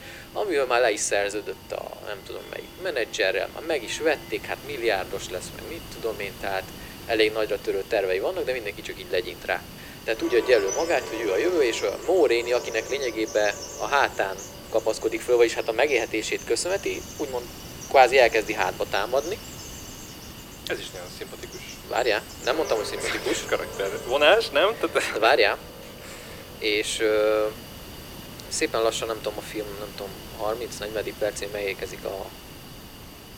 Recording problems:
thin; very; fading below 350 Hz
background music; noticeable; throughout; 15 dB below the speech
animal sounds; noticeable; from 10 s on; 15 dB below the speech
hiss; noticeable; throughout; 15 dB below the speech

